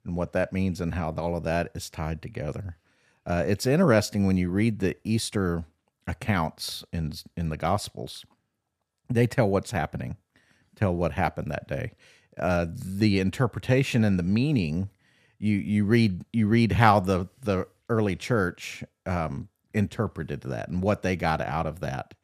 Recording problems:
none

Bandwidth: 14.5 kHz